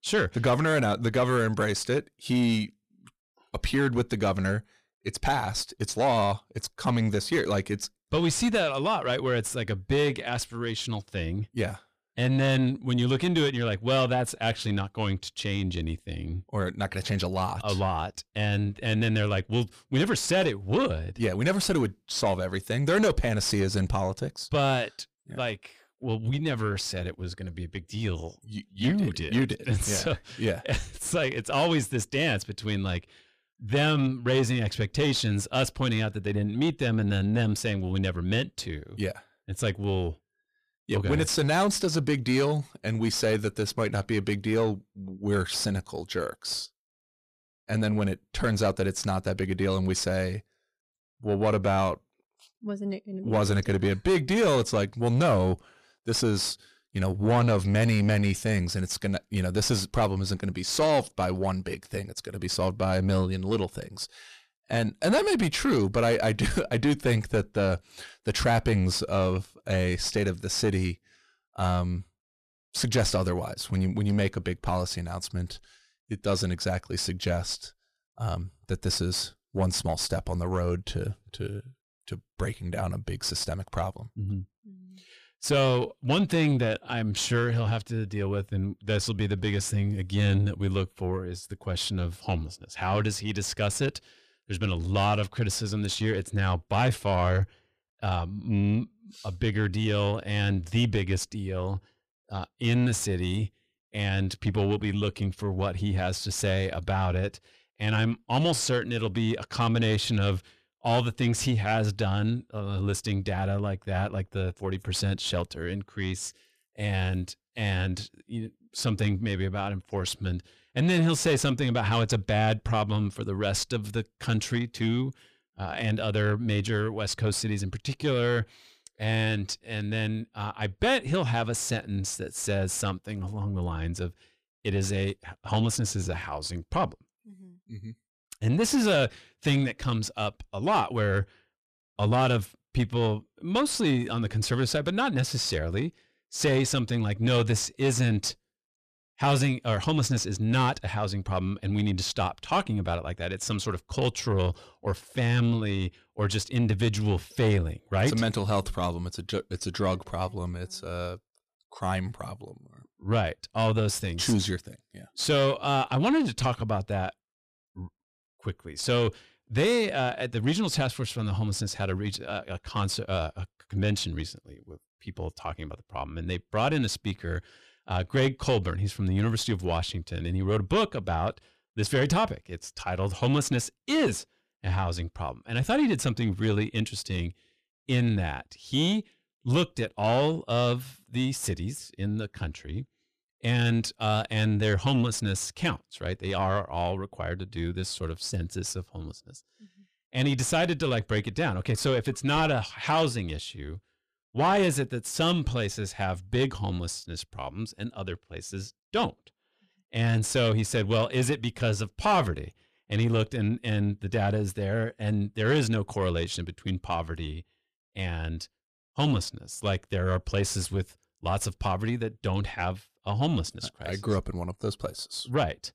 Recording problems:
distortion; slight; 10 dB below the speech

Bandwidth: 14.5 kHz